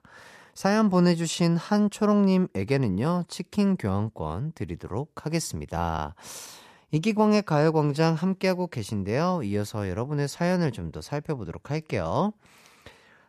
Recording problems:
none

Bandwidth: 14.5 kHz